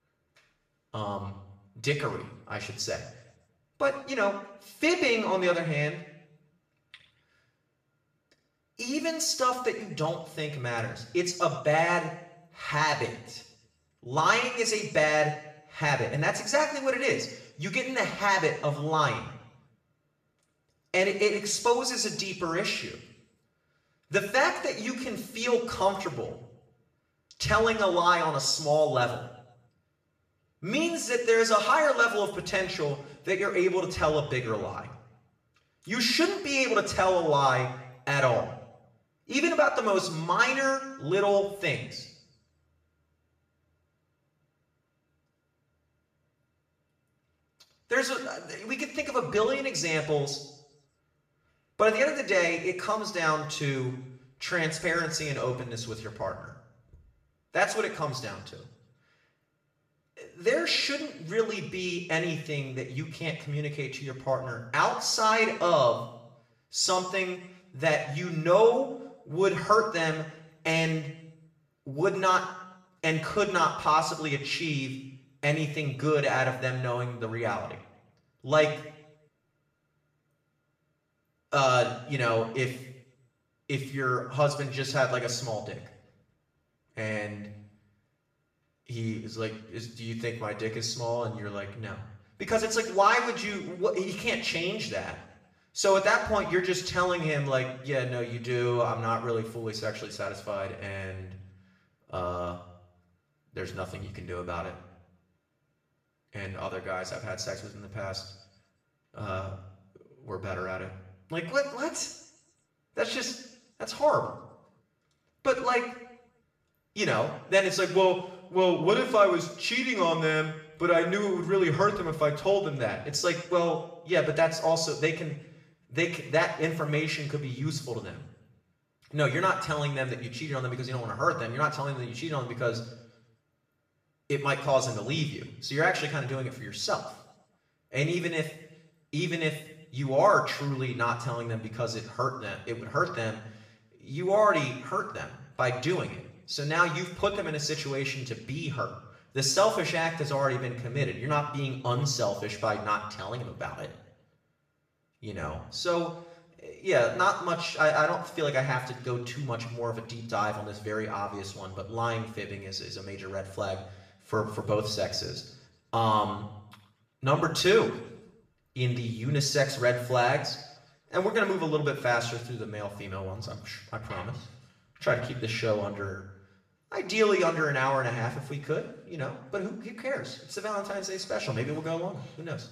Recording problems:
off-mic speech; far
room echo; slight; dies away in 0.7 s

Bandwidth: 14.5 kHz